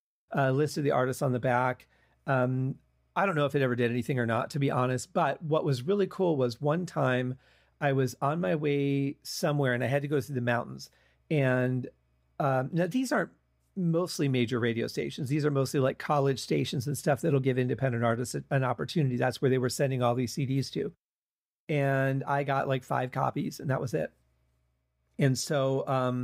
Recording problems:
abrupt cut into speech; at the end

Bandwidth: 15.5 kHz